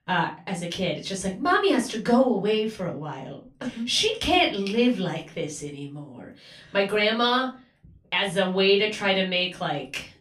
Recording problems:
off-mic speech; far
room echo; very slight; dies away in 0.3 s

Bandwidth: 15 kHz